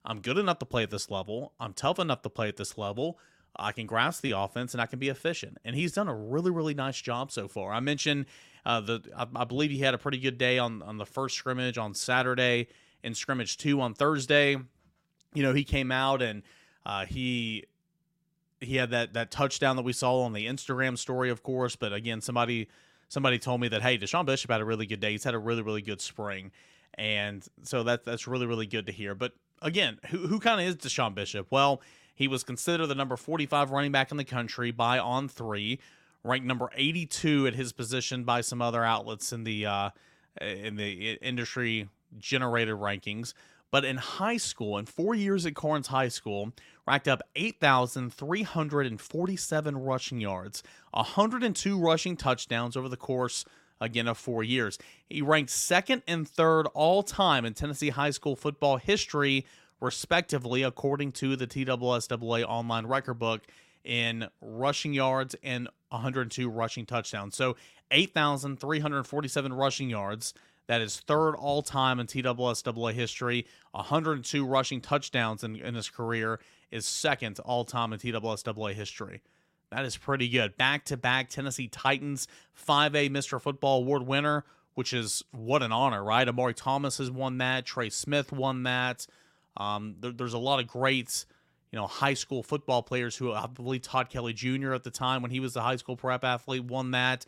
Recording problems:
none

